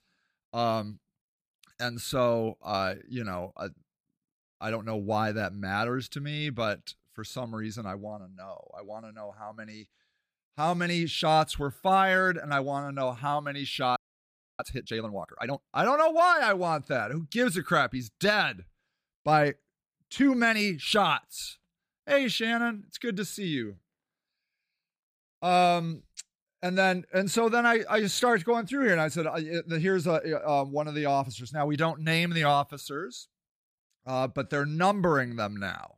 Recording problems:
audio freezing; at 14 s for 0.5 s

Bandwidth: 15 kHz